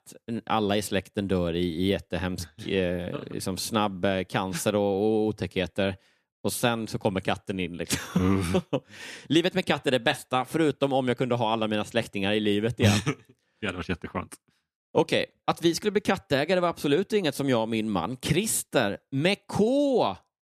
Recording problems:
none

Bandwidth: 14 kHz